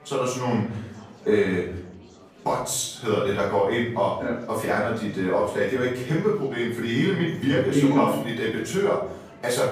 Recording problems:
off-mic speech; far
room echo; noticeable; dies away in 0.6 s
murmuring crowd; faint; throughout; 25 dB below the speech

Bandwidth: 15 kHz